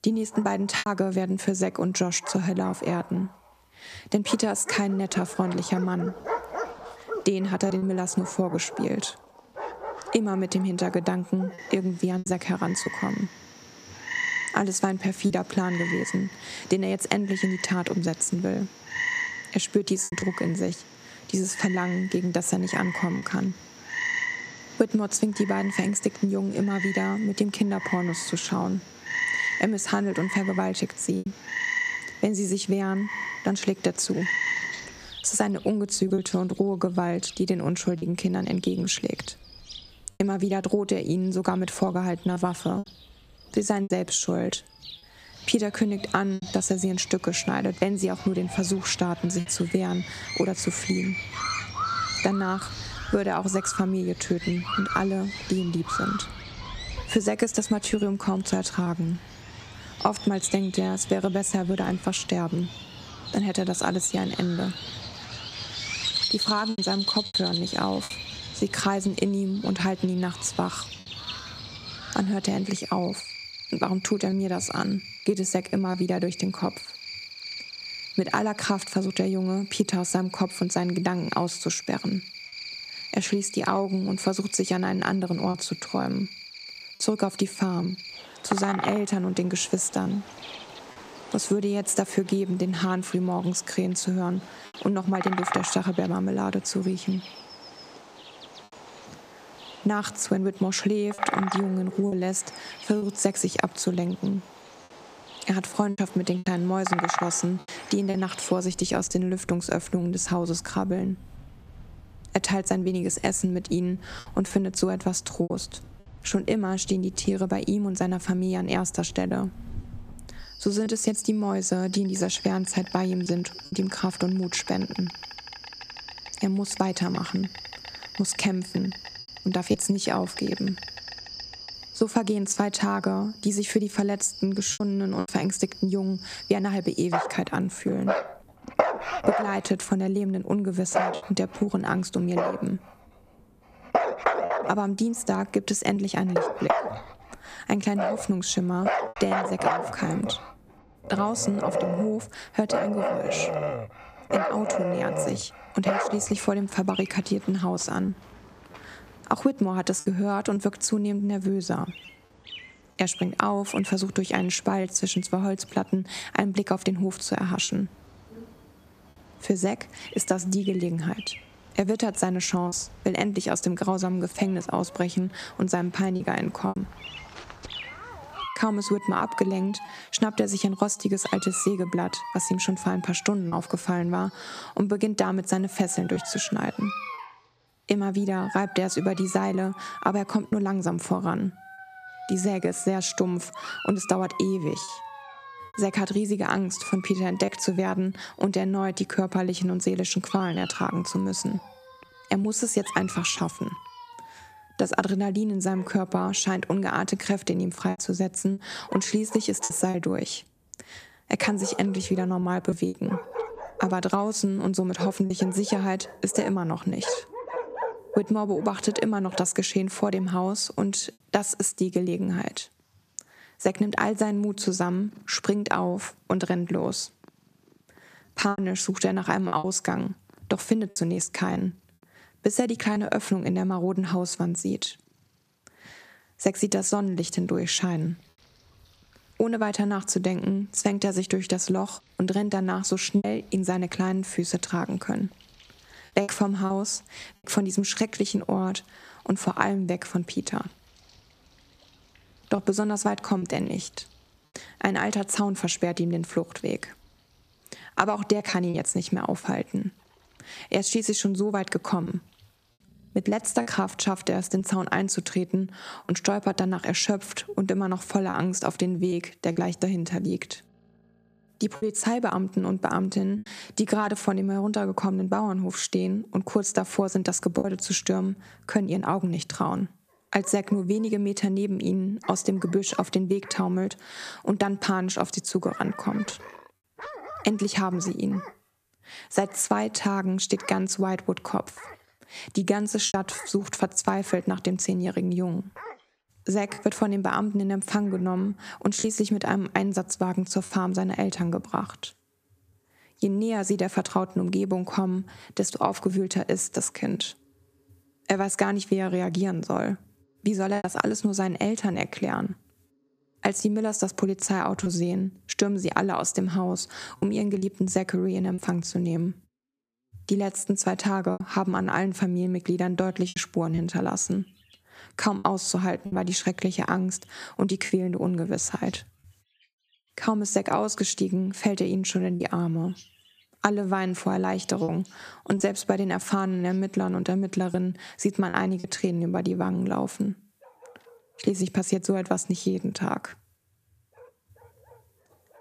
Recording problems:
squashed, flat; somewhat, background pumping
animal sounds; loud; throughout; 8 dB below the speech
choppy; occasionally; 2% of the speech affected

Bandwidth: 14.5 kHz